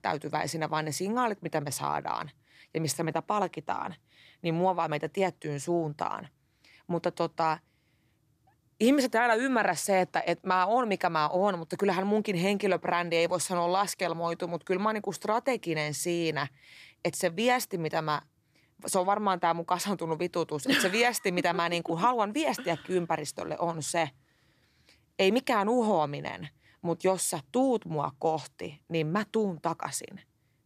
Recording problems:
none

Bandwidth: 14.5 kHz